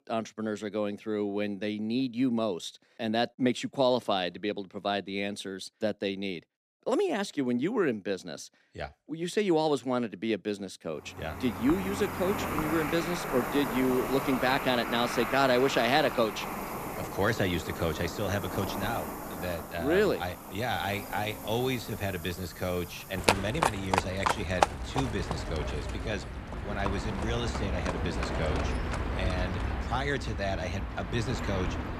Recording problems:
animal sounds; loud; from 11 s on; 3 dB below the speech

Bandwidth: 14.5 kHz